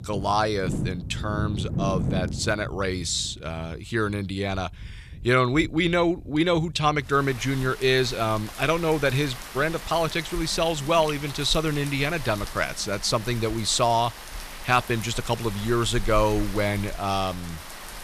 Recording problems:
rain or running water; noticeable; throughout; 10 dB below the speech

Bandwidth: 14.5 kHz